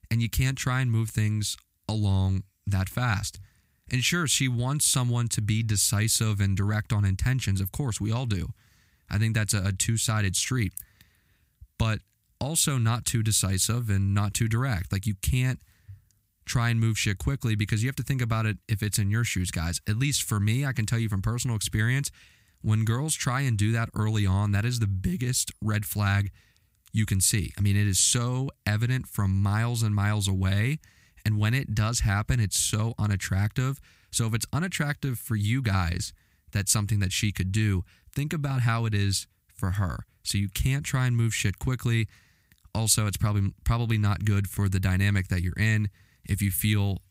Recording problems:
none

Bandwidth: 15.5 kHz